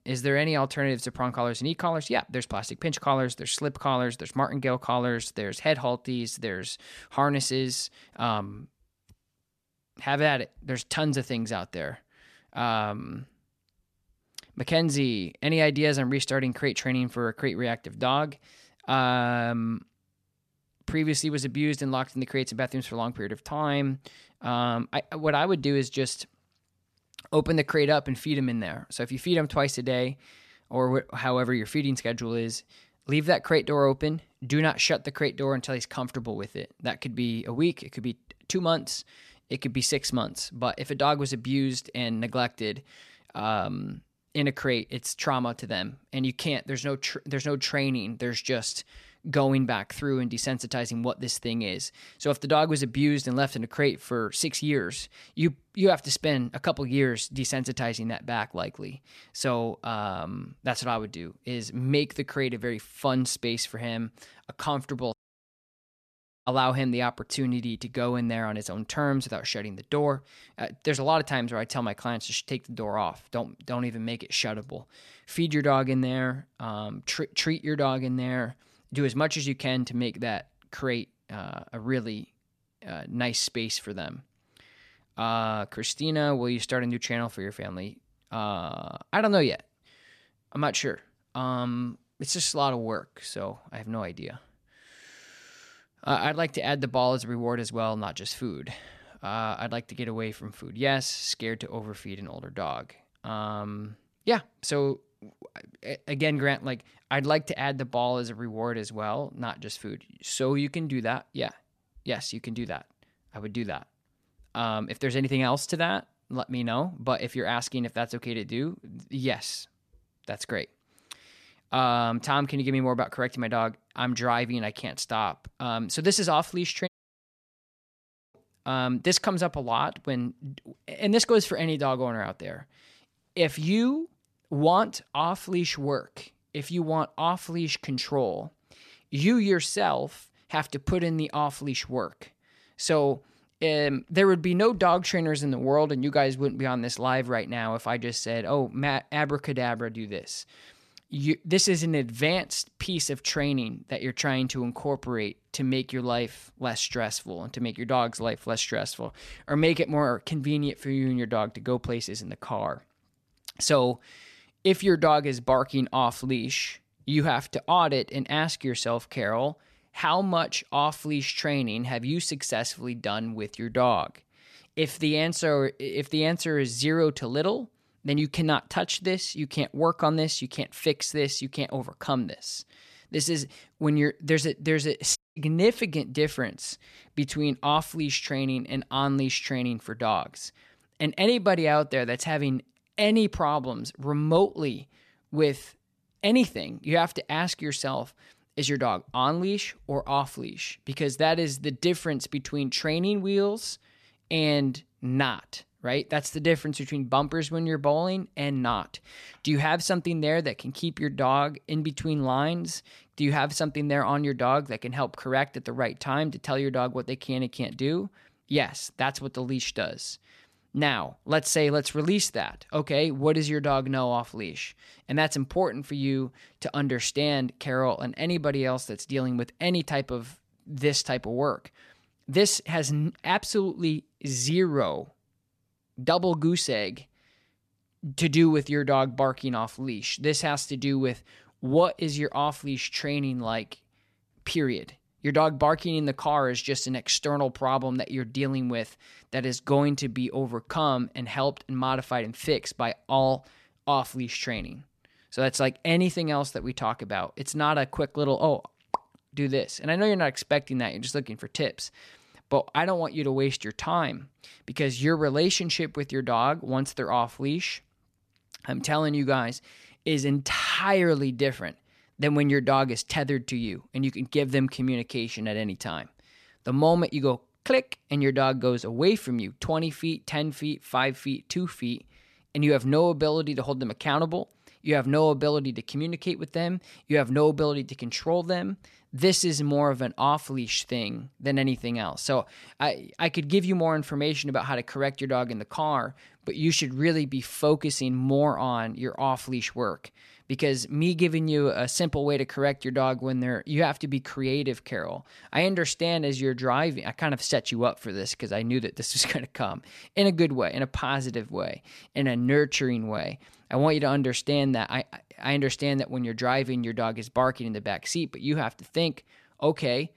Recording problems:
audio cutting out; at 1:05 for 1.5 s, at 2:07 for 1.5 s and at 3:05

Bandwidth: 14 kHz